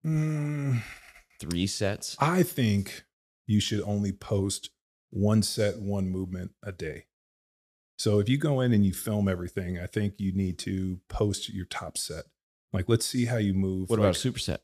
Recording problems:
none

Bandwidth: 14 kHz